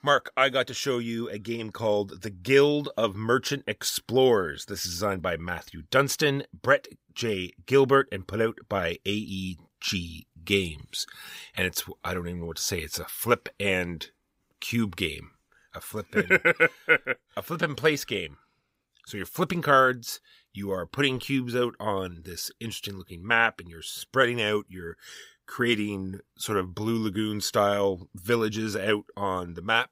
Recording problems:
none

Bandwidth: 15.5 kHz